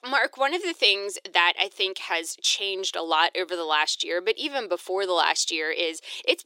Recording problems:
thin; very; fading below 350 Hz

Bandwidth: 16 kHz